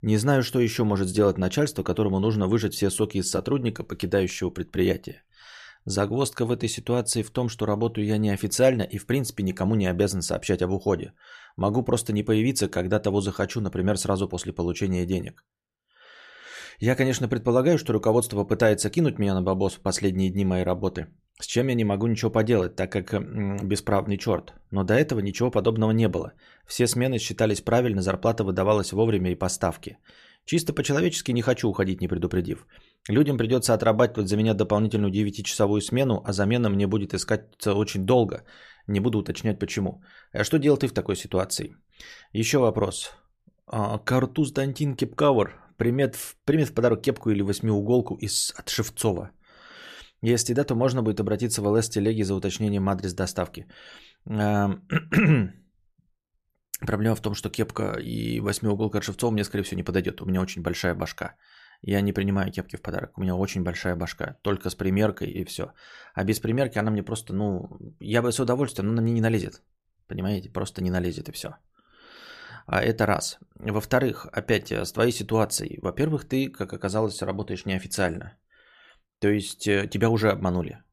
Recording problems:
none

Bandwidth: 14.5 kHz